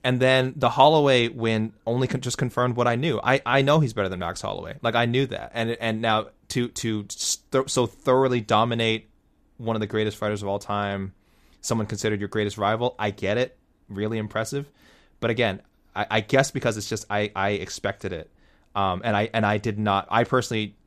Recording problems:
none

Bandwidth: 14.5 kHz